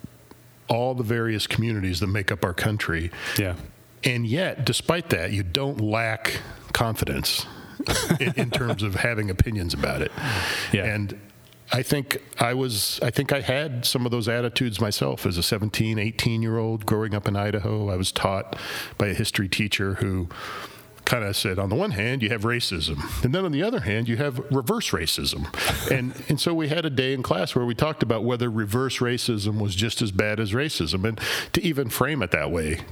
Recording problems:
squashed, flat; heavily

